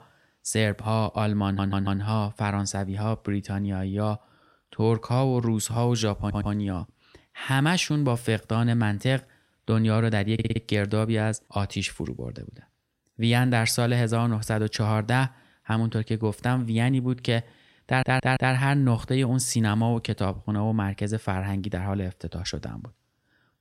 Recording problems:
audio stuttering; 4 times, first at 1.5 s

